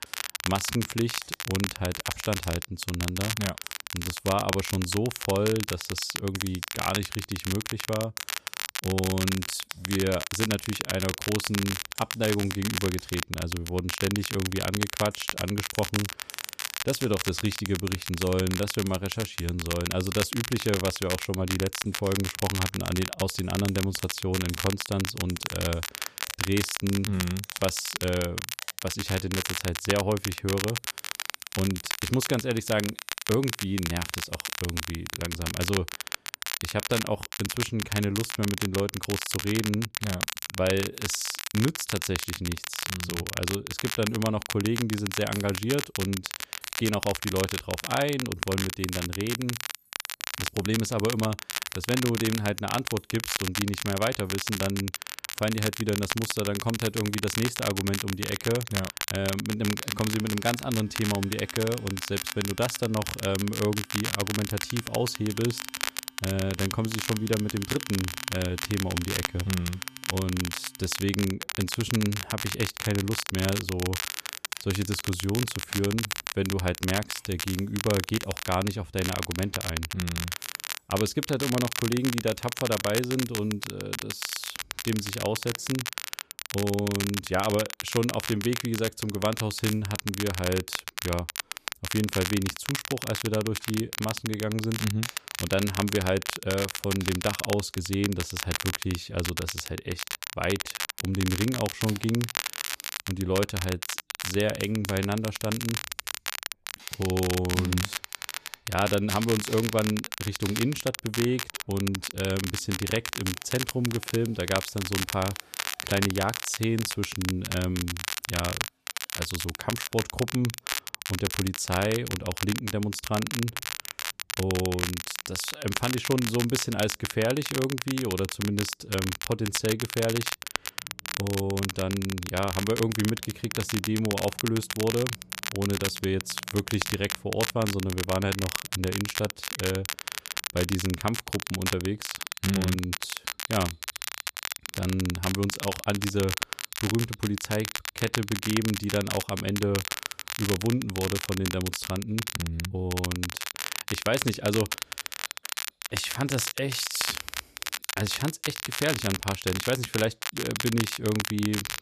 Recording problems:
crackle, like an old record; loud; 3 dB below the speech
household noises; faint; throughout; 25 dB below the speech

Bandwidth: 14.5 kHz